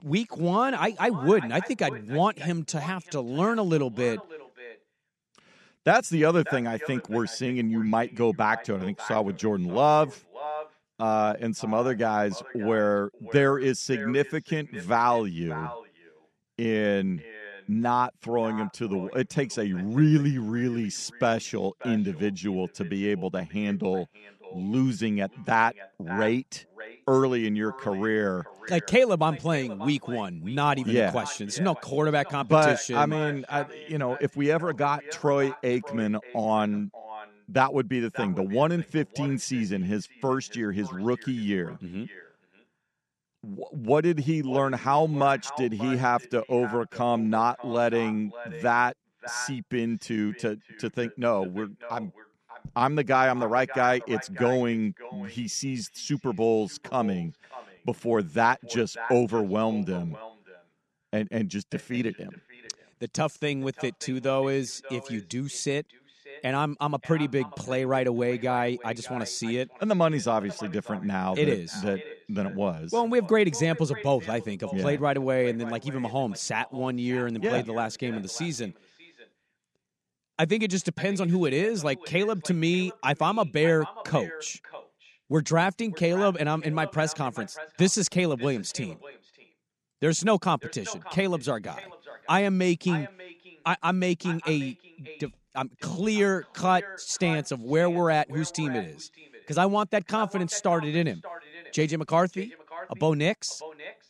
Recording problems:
echo of what is said; noticeable; throughout; 590 ms later, 15 dB below the speech

